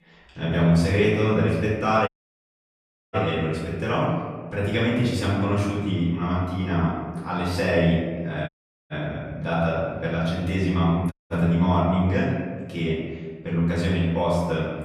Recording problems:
off-mic speech; far
room echo; noticeable; dies away in 1.4 s
audio cutting out; at 2 s for 1 s, at 8.5 s and at 11 s

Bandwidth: 14.5 kHz